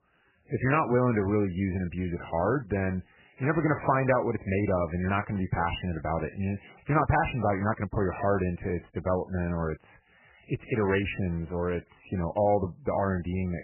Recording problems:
garbled, watery; badly; nothing above 3 kHz

